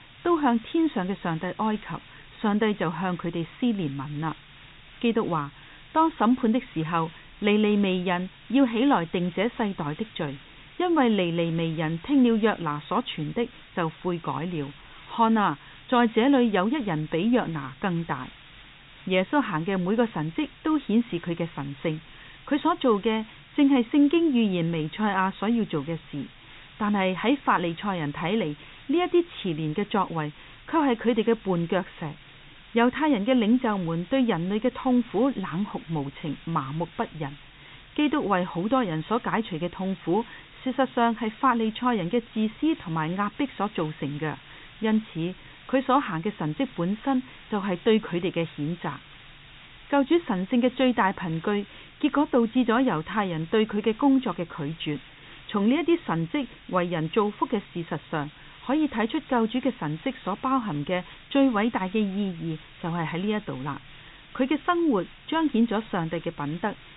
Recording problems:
high frequencies cut off; severe; nothing above 4 kHz
hiss; faint; throughout; 20 dB below the speech

